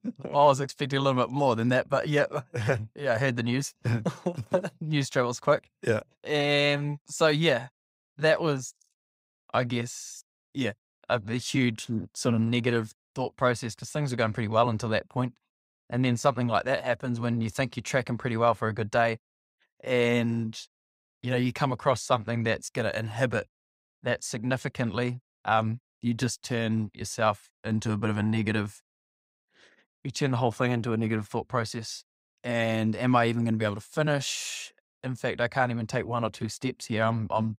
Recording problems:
none

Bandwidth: 15.5 kHz